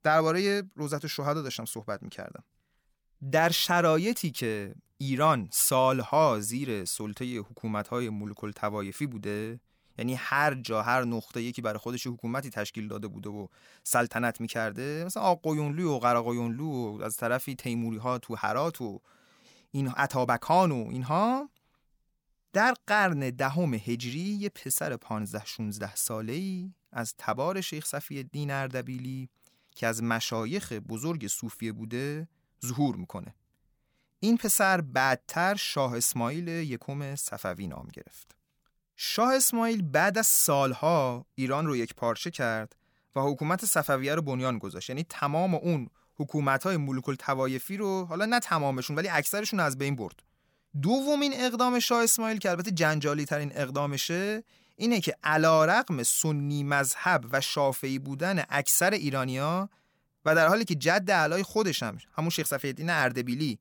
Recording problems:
none

